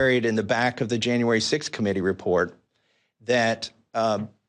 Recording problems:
abrupt cut into speech; at the start

